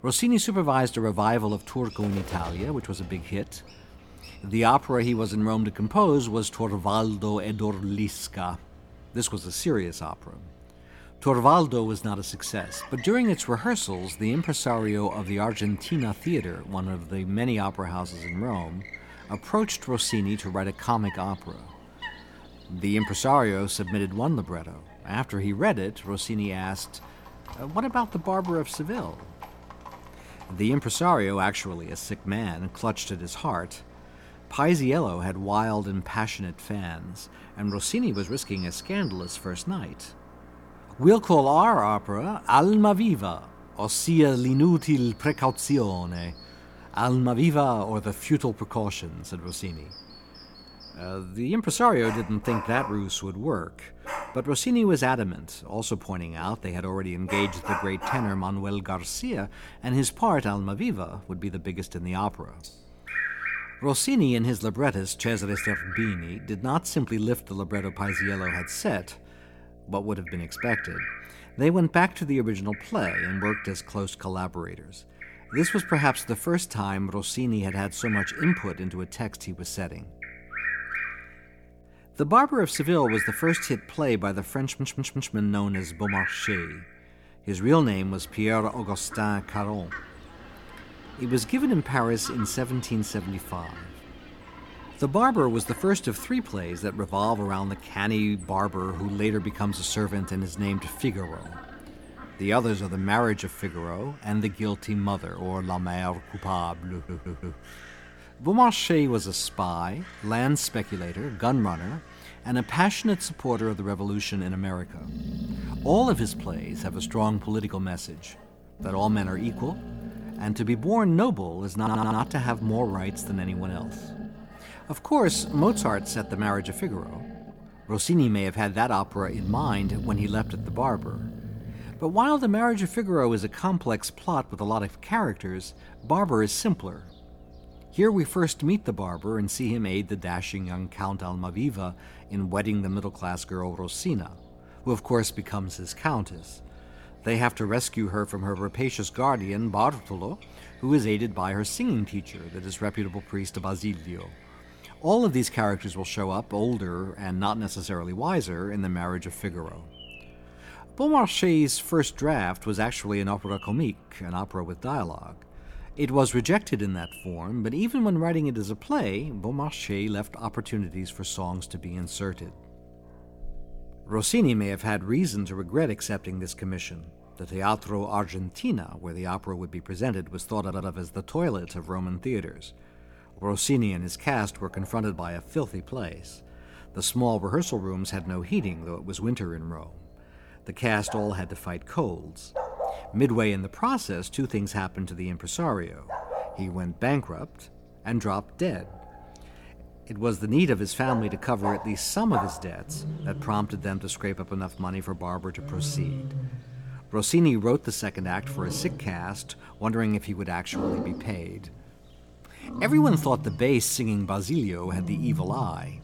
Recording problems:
animal sounds; noticeable; throughout; 10 dB below the speech
electrical hum; faint; throughout; 60 Hz, 30 dB below the speech
audio stuttering; 4 times, first at 1:25

